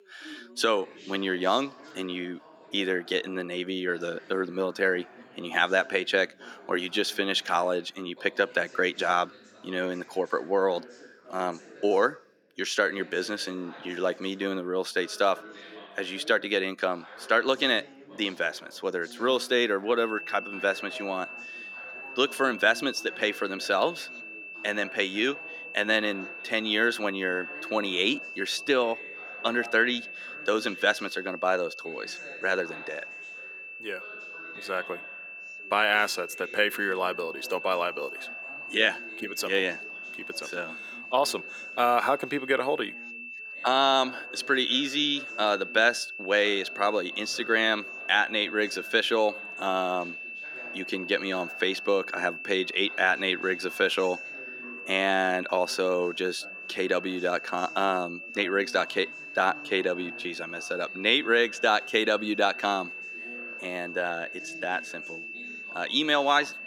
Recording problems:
thin; somewhat; fading below 300 Hz
high-pitched whine; noticeable; from 20 s on; 2.5 kHz, 10 dB below the speech
background chatter; faint; throughout; 3 voices, 20 dB below the speech

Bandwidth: 17 kHz